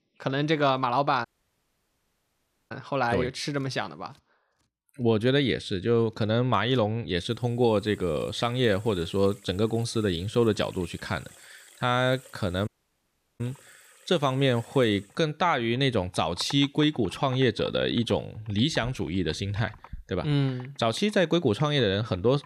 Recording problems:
household noises; faint; throughout; 25 dB below the speech
audio cutting out; at 1.5 s for 1.5 s and at 13 s for 0.5 s

